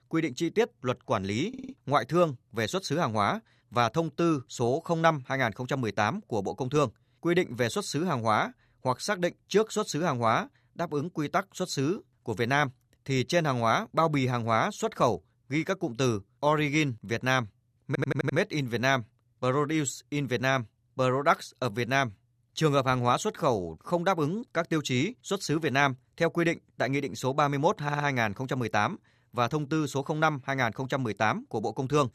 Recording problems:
audio stuttering; at 1.5 s, at 18 s and at 28 s

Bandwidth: 14.5 kHz